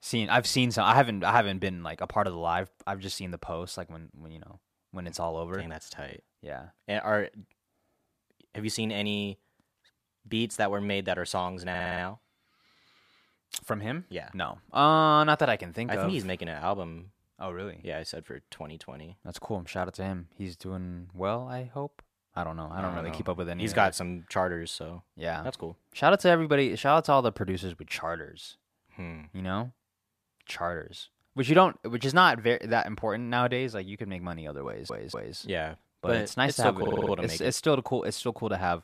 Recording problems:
audio stuttering; at 12 s, at 35 s and at 37 s

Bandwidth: 14.5 kHz